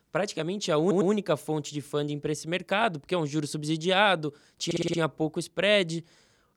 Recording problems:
audio stuttering; at 1 s and at 4.5 s

